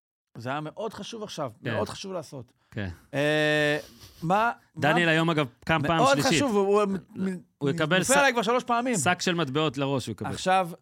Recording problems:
none

